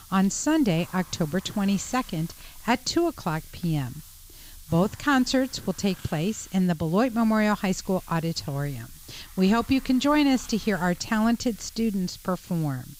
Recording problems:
high frequencies cut off; noticeable; nothing above 8 kHz
hiss; noticeable; throughout; 20 dB below the speech

